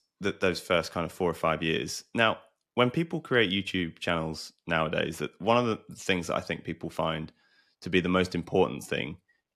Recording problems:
none

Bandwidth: 13.5 kHz